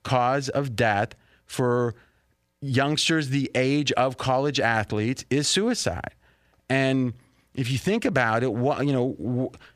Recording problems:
none

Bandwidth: 15 kHz